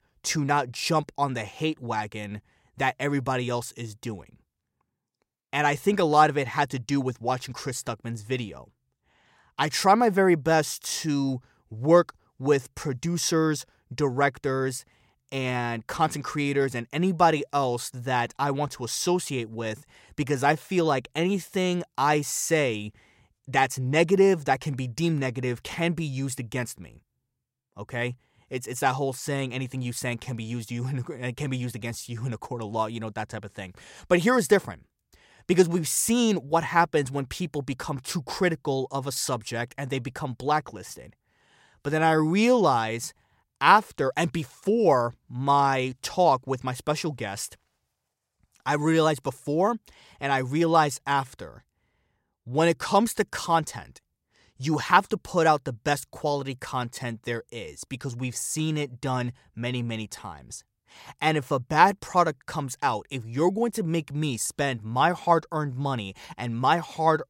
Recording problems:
none

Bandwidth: 16 kHz